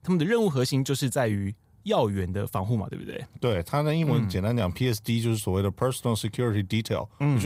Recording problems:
abrupt cut into speech; at the end

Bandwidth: 15.5 kHz